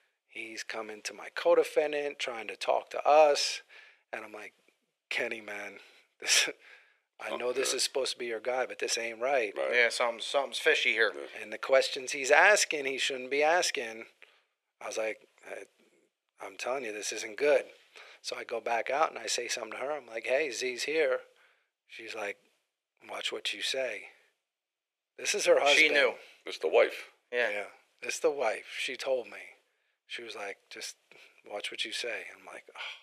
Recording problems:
thin; very; fading below 450 Hz

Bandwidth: 14.5 kHz